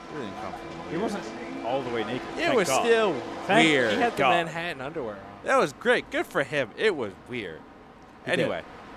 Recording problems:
train or aircraft noise; noticeable; throughout; 15 dB below the speech

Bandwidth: 14 kHz